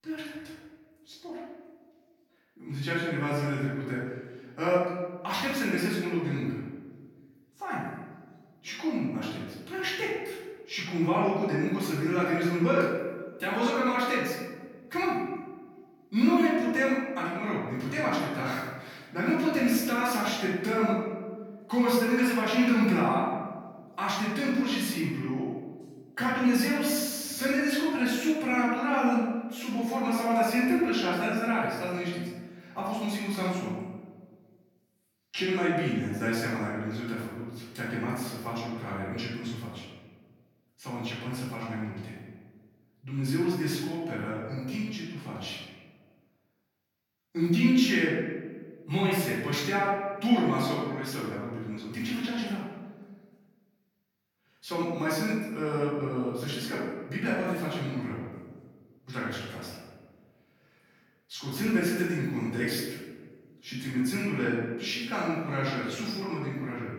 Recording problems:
off-mic speech; far
room echo; noticeable; dies away in 1.2 s

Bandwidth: 17.5 kHz